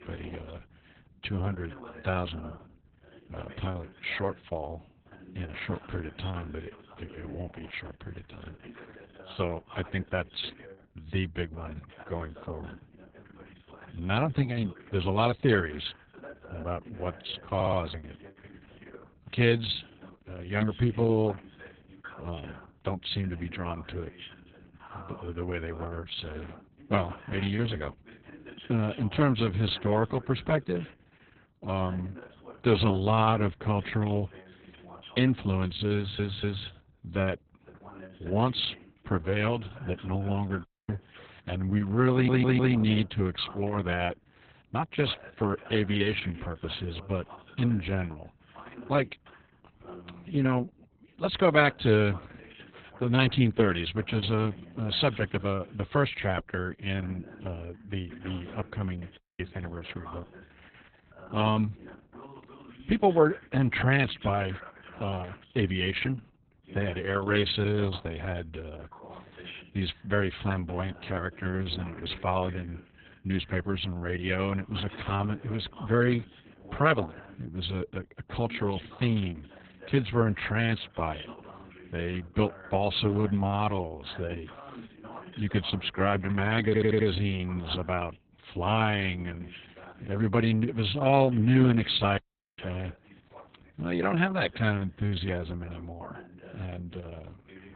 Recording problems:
garbled, watery; badly; nothing above 4 kHz
voice in the background; faint; throughout; 20 dB below the speech
audio stuttering; 4 times, first at 18 s
audio cutting out; at 41 s, at 59 s and at 1:32

